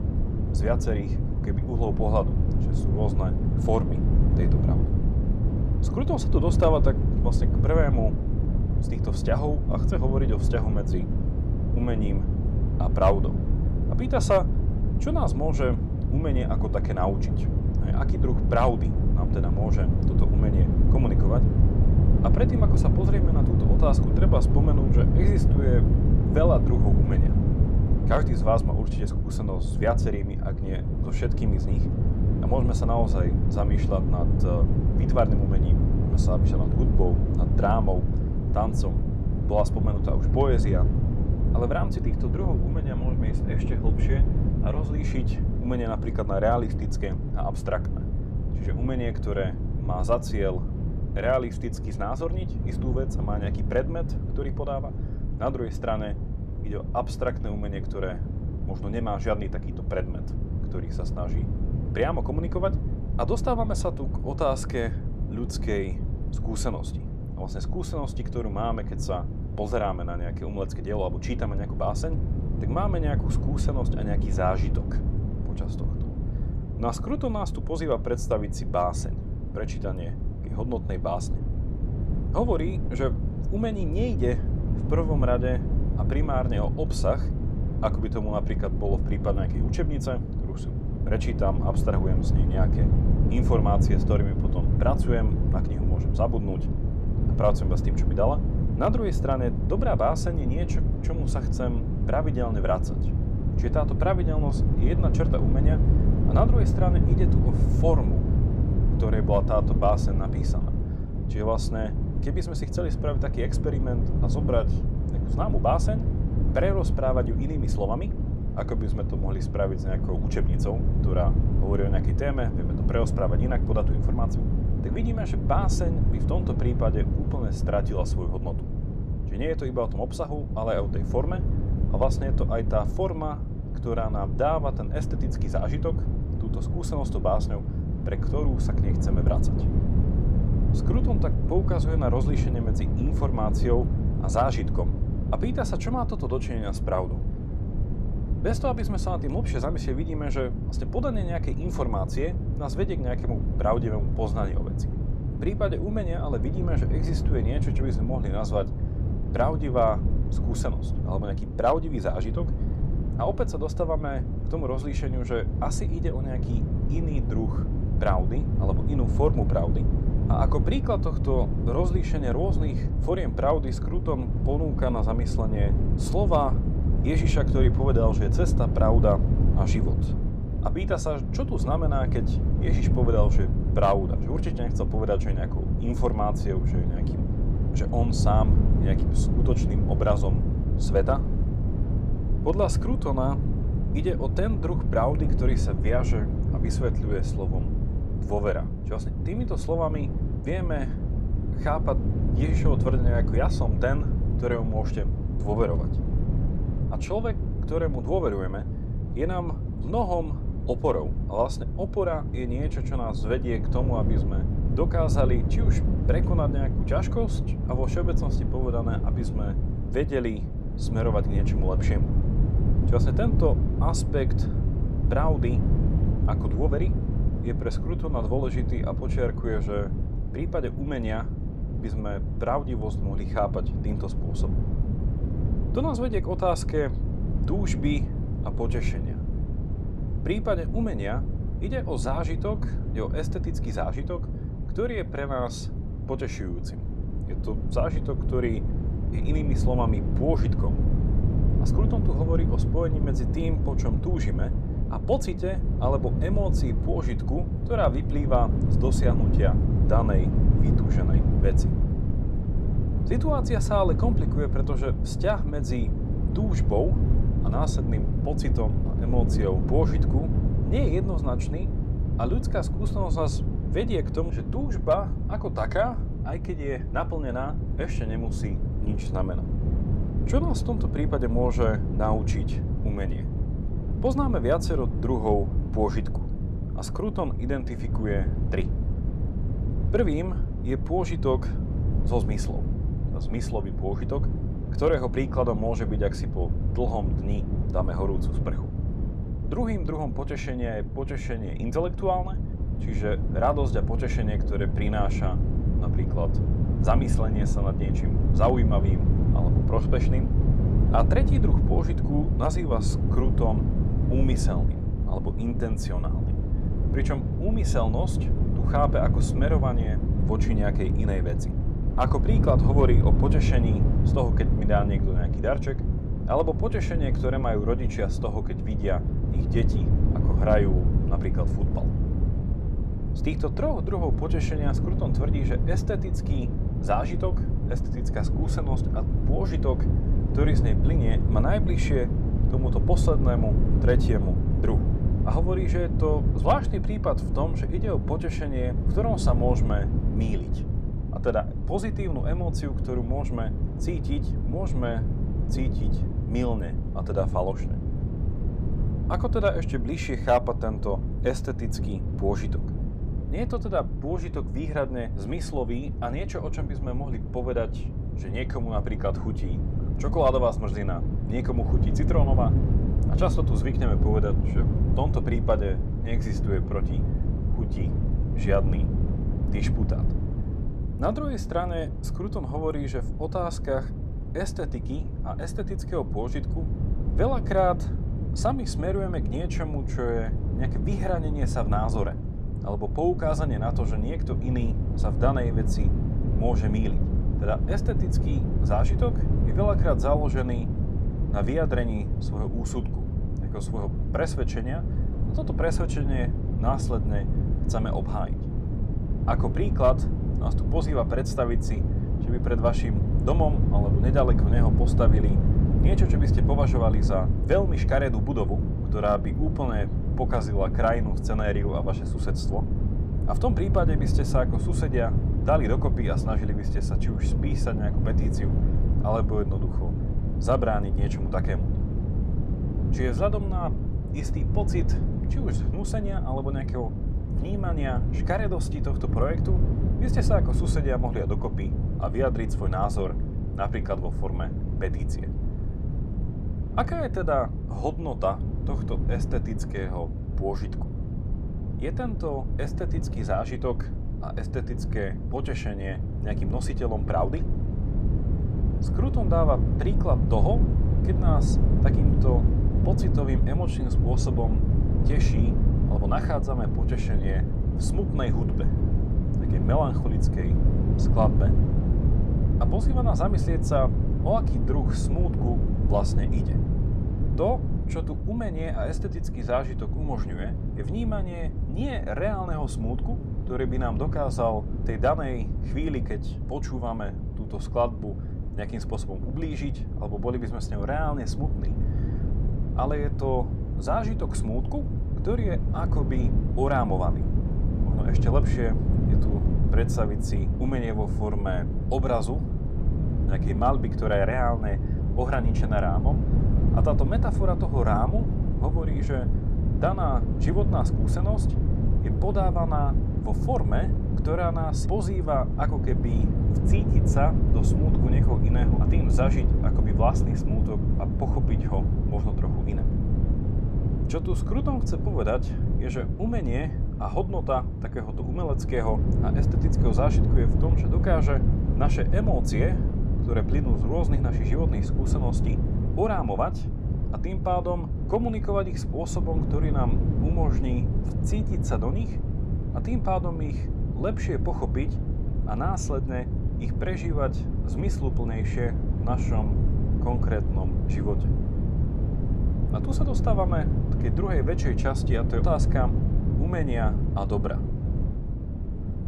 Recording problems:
wind noise on the microphone; heavy; 7 dB below the speech

